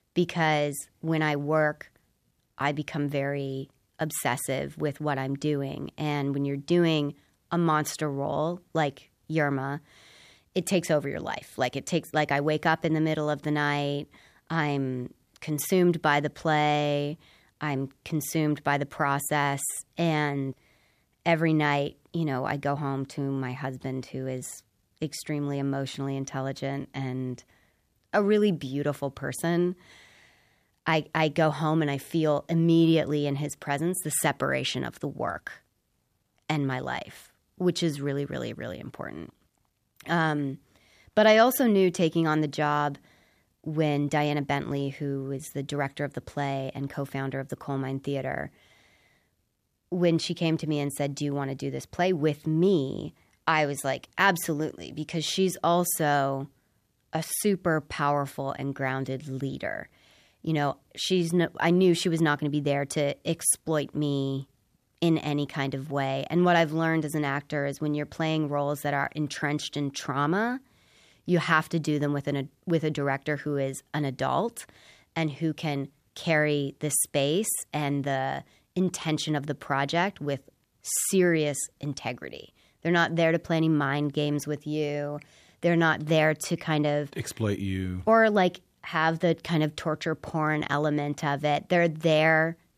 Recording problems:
none

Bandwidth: 14.5 kHz